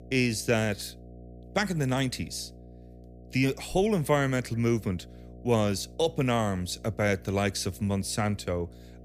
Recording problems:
electrical hum; faint; throughout; 60 Hz, 25 dB below the speech

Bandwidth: 15 kHz